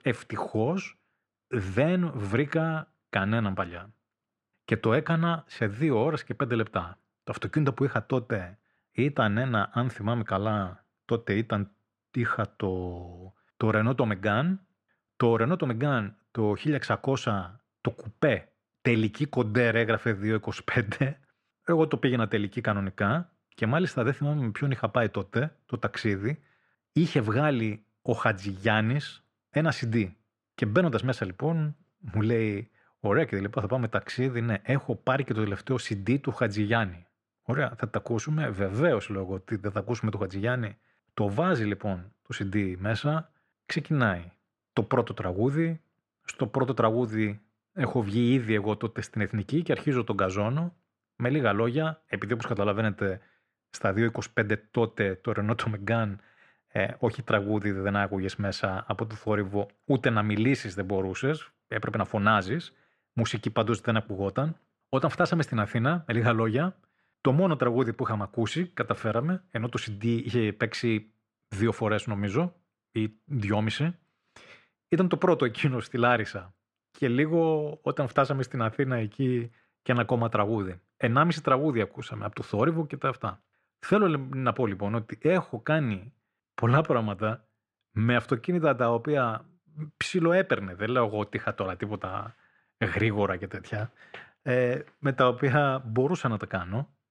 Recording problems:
muffled; slightly; fading above 2.5 kHz

